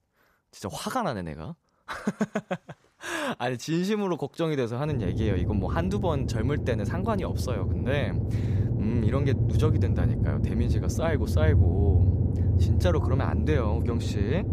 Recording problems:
low rumble; loud; from 5 s on; 6 dB below the speech
electrical hum; noticeable; from 5 s on; 60 Hz, 20 dB below the speech

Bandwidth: 14.5 kHz